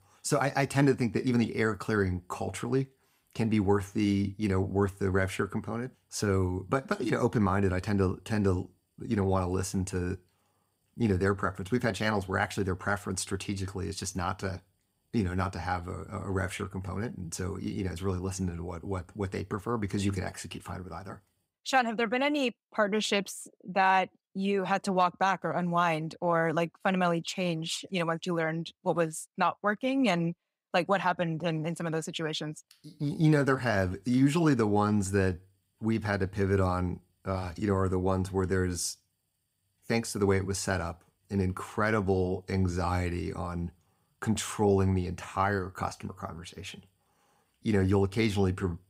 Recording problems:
none

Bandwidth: 15.5 kHz